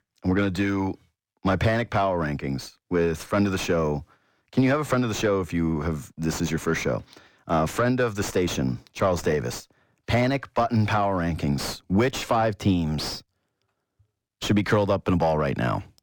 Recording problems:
distortion; slight; 9 dB below the speech

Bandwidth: 17 kHz